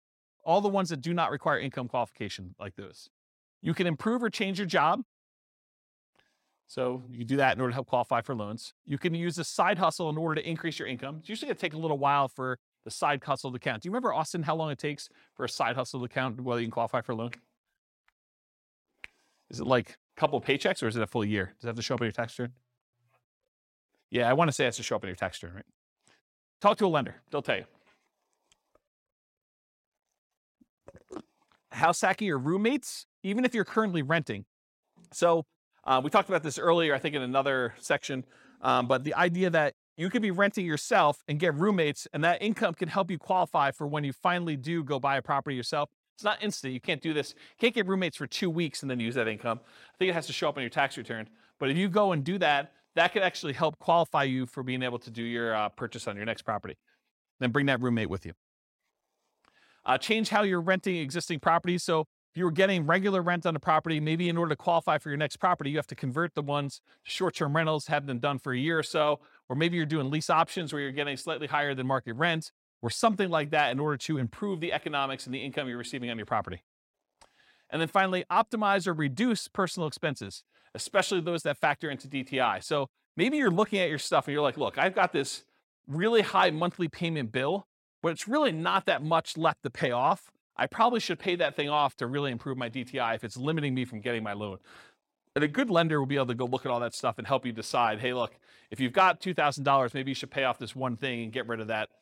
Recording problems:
none

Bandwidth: 16.5 kHz